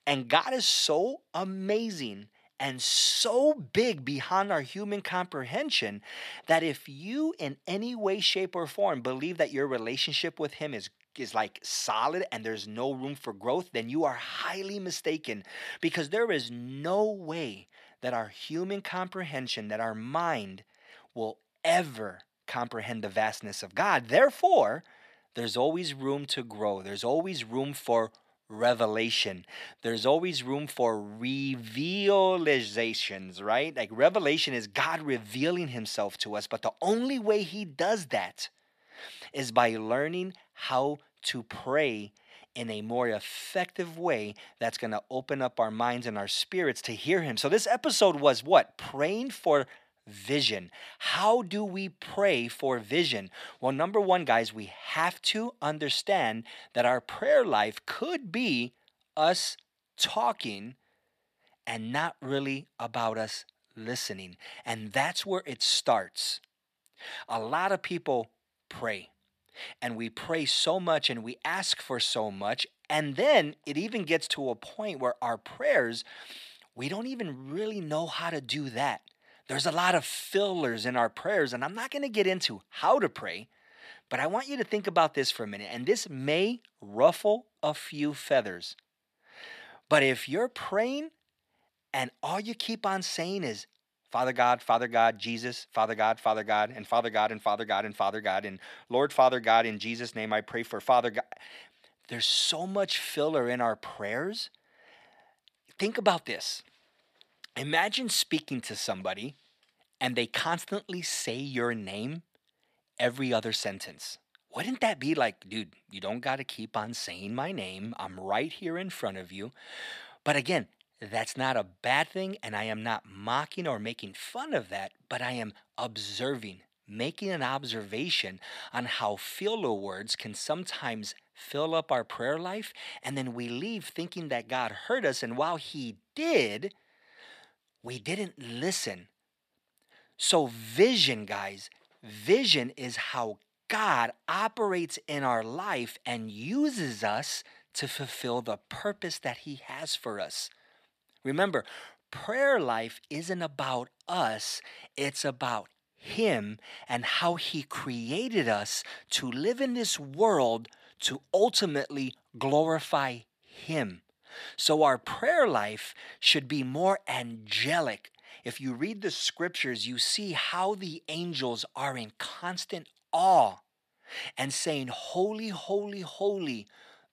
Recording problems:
thin; somewhat; fading below 800 Hz

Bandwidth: 14.5 kHz